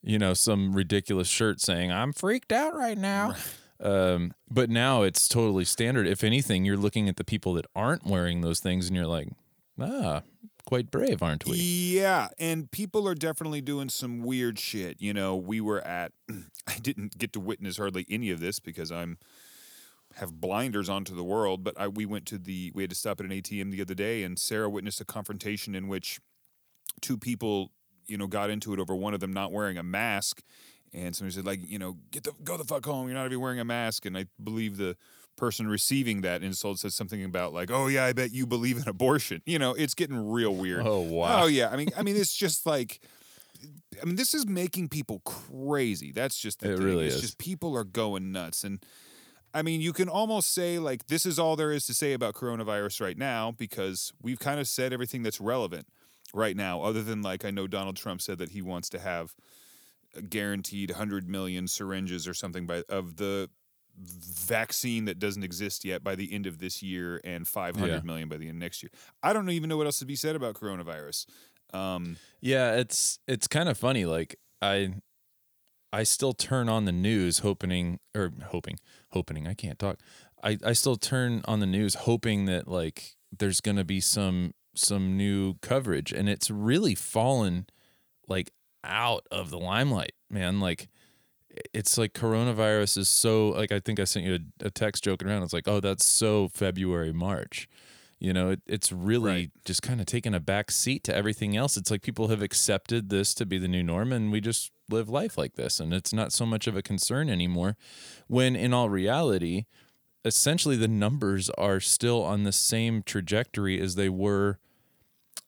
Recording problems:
none

